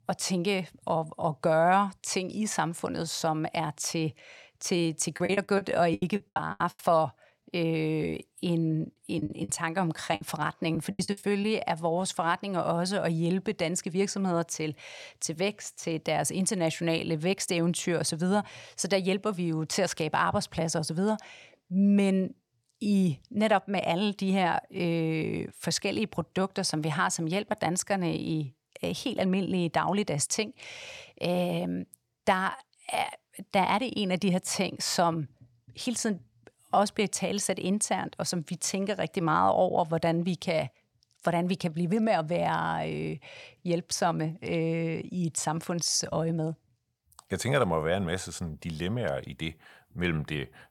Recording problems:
choppy; very; from 5 to 7 s and from 9 to 11 s; 20% of the speech affected

